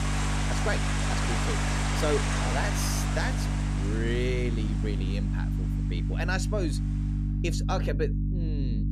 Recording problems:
rain or running water; very loud; throughout; 1 dB above the speech
electrical hum; loud; throughout; 50 Hz, 7 dB below the speech

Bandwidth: 14.5 kHz